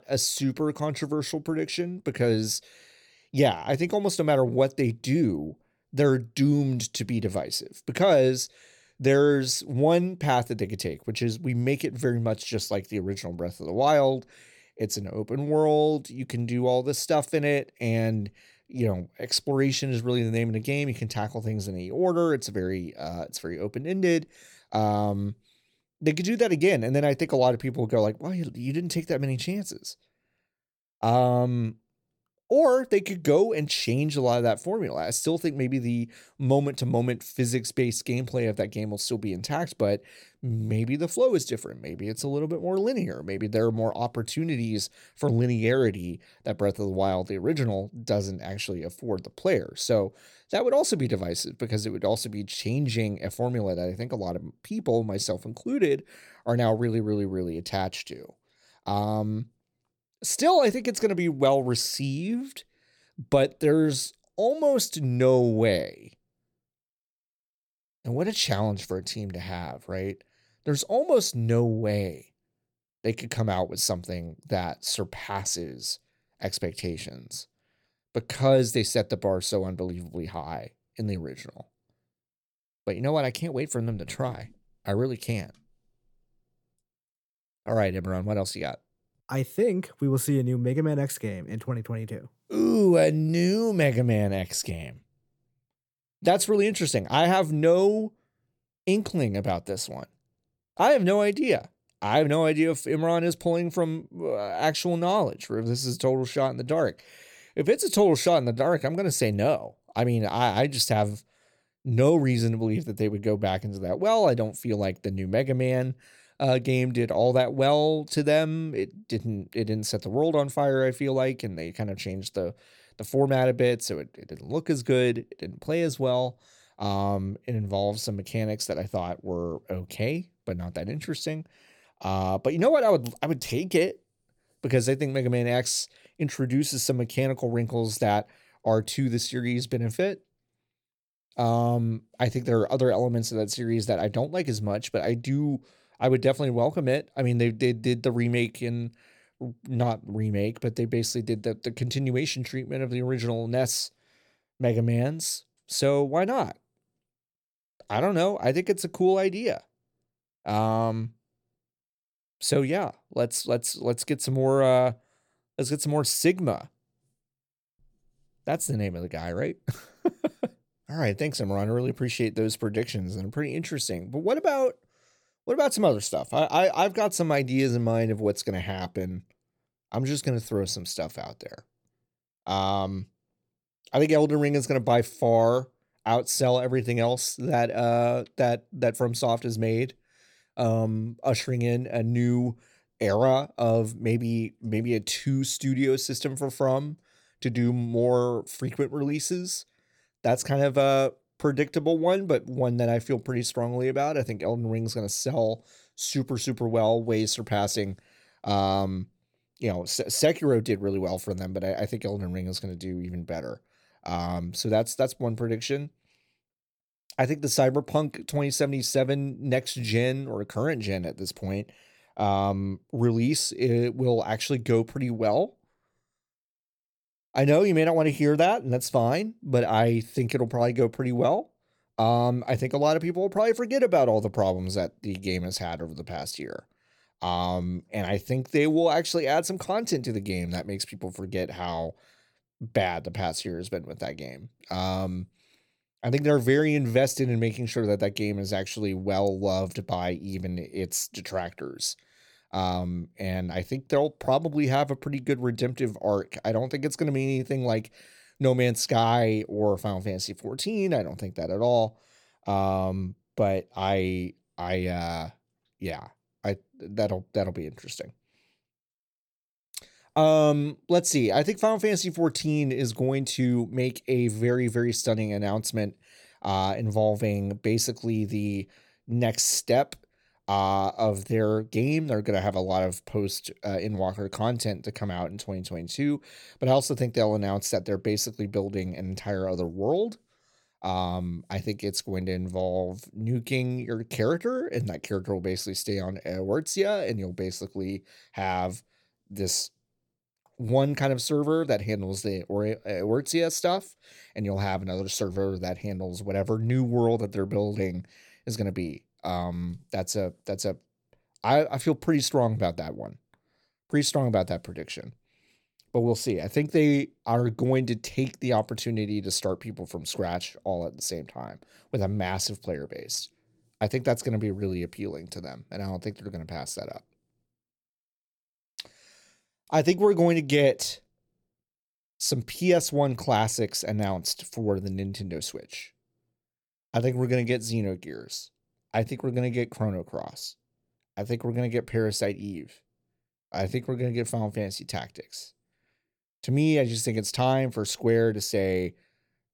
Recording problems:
none

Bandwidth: 18 kHz